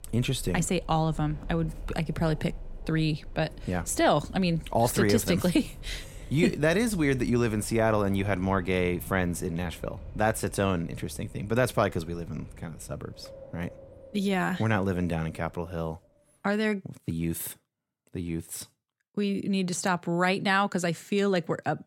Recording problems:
wind in the background; noticeable; until 16 s; 20 dB below the speech

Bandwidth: 16.5 kHz